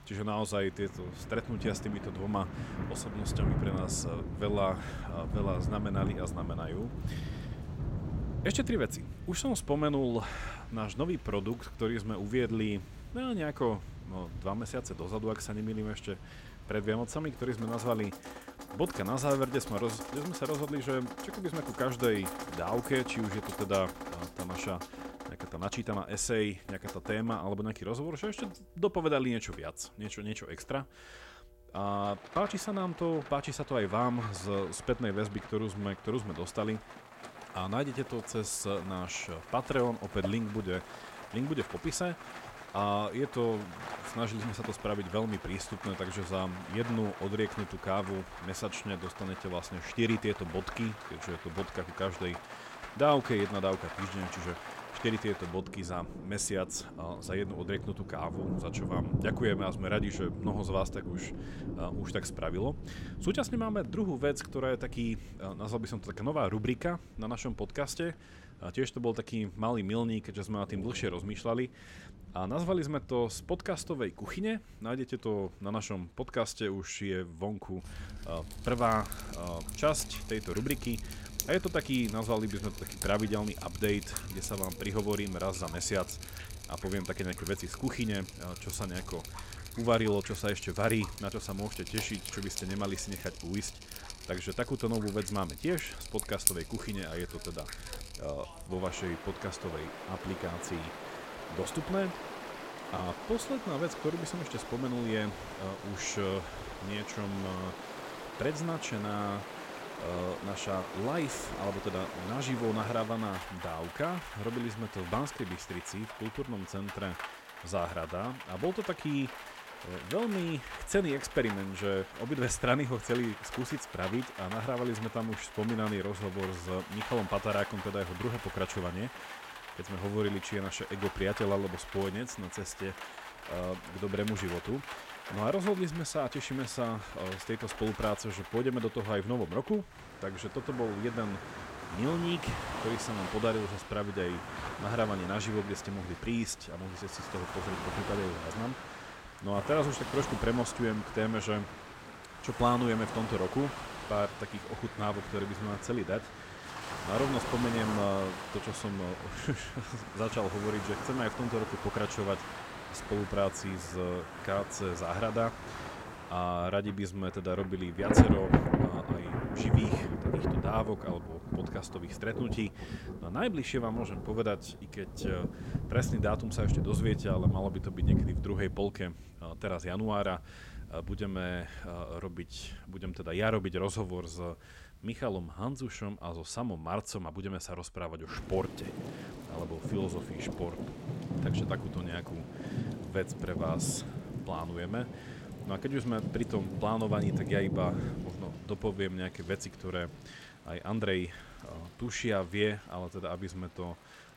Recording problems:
rain or running water; loud; throughout; 5 dB below the speech

